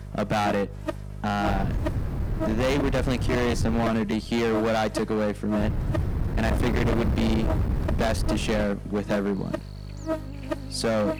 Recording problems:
distortion; heavy; 22% of the sound clipped
wind noise on the microphone; heavy; from 1.5 to 4 s and from 5.5 to 8.5 s; 8 dB below the speech
electrical hum; loud; throughout; 50 Hz, 8 dB below the speech
animal sounds; faint; throughout; 25 dB below the speech
uneven, jittery; strongly; from 2.5 to 8.5 s

